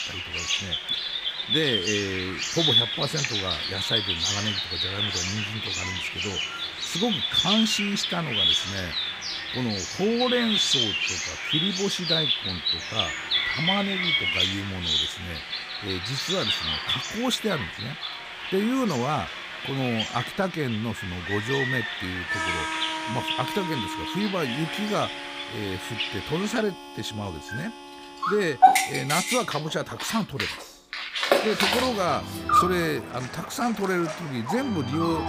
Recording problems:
animal sounds; very loud; throughout; 4 dB above the speech
background music; loud; throughout; 7 dB below the speech

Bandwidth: 15 kHz